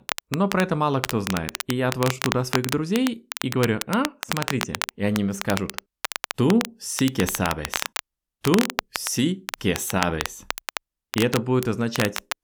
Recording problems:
crackle, like an old record; loud; 6 dB below the speech

